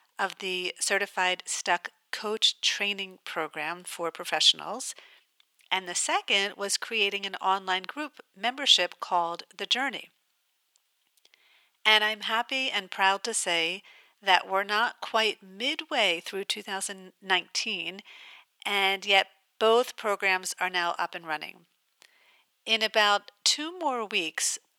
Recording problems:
thin; very; fading below 800 Hz

